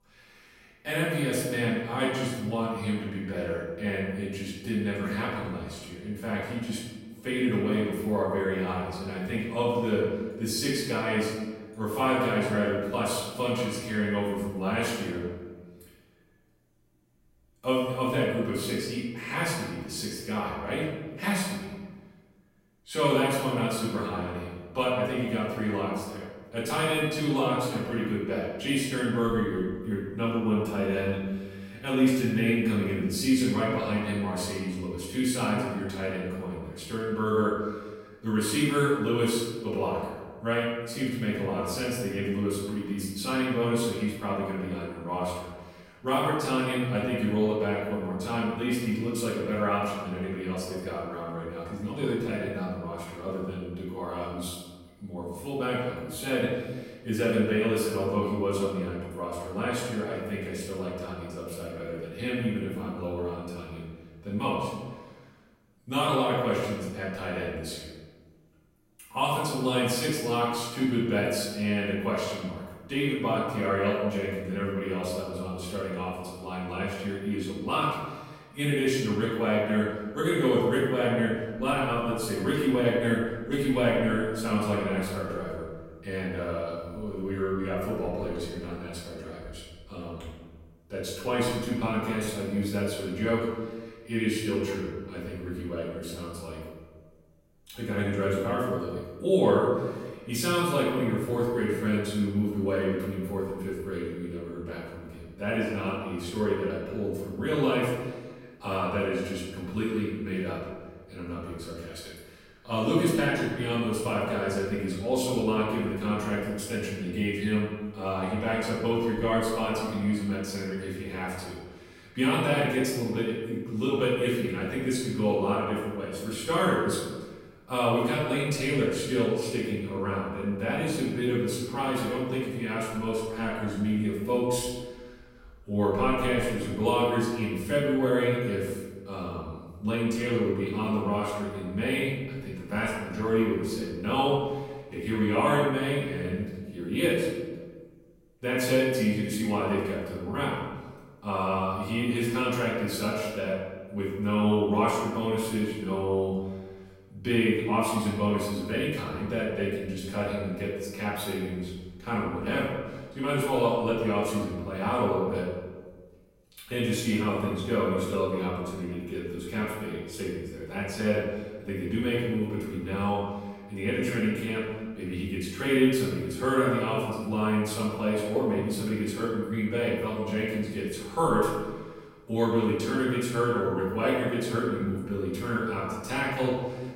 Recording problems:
off-mic speech; far
room echo; noticeable; dies away in 1.2 s

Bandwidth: 16 kHz